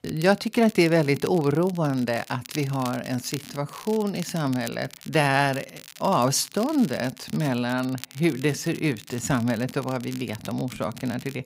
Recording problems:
crackle, like an old record; noticeable; 20 dB below the speech

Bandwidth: 15.5 kHz